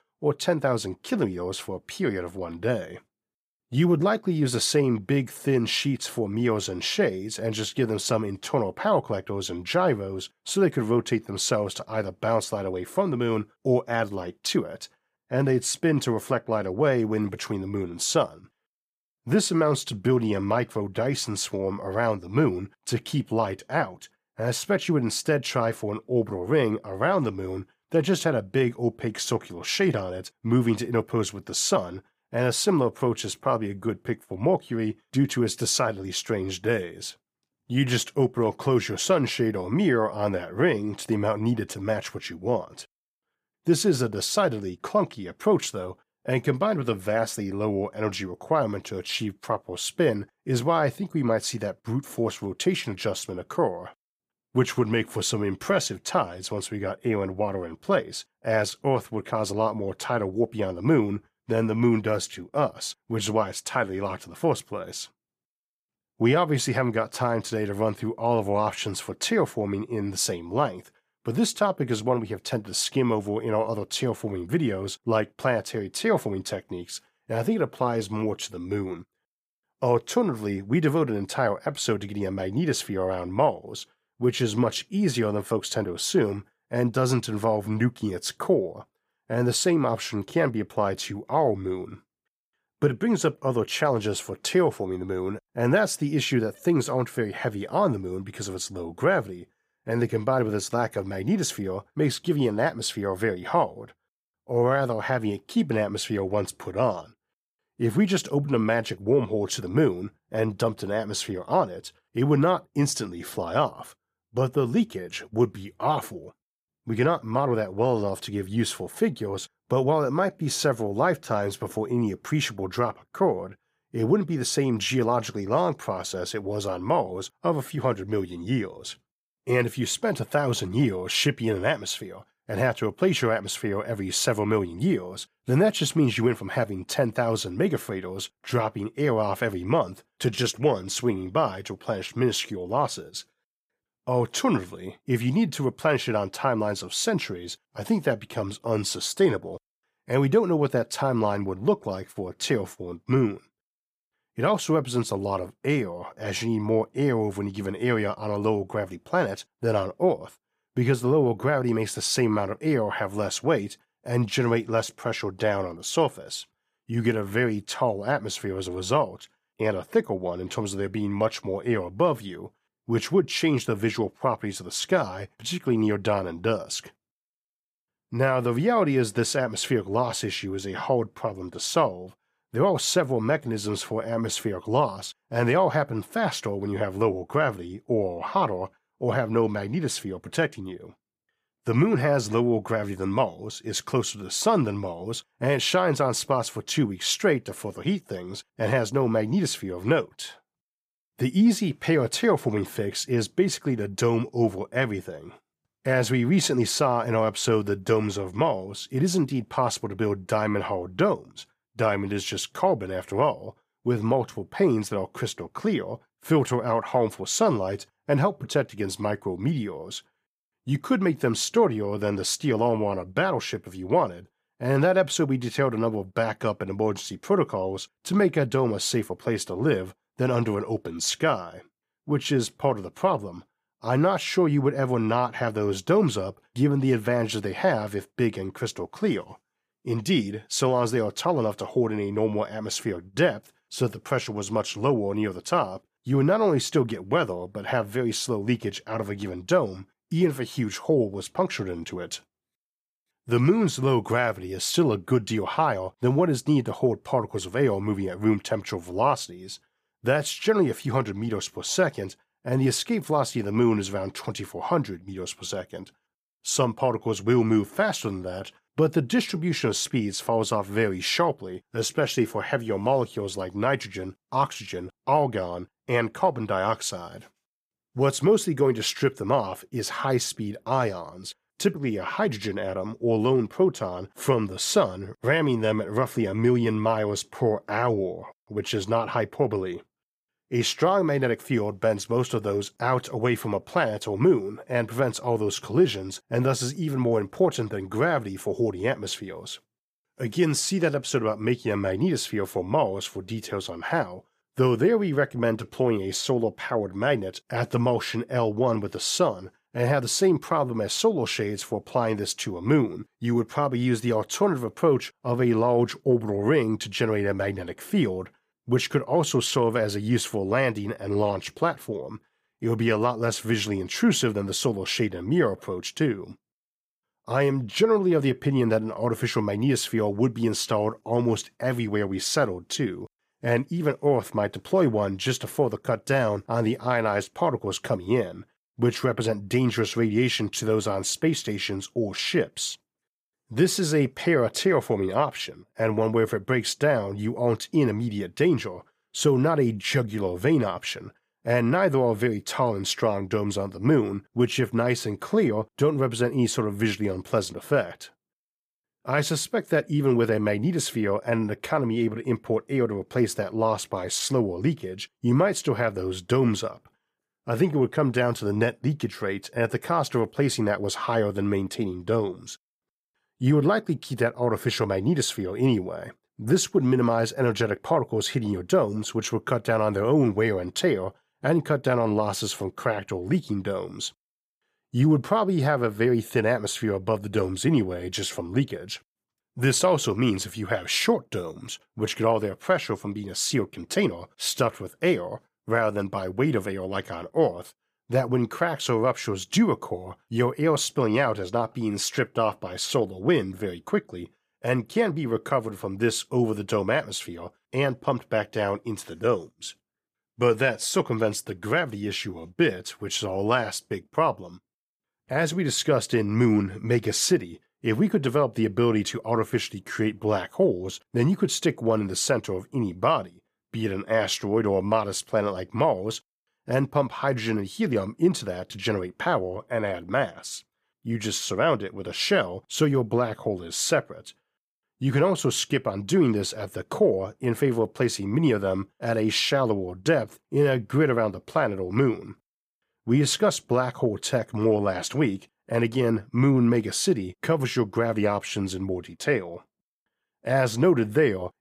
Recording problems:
none

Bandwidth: 15 kHz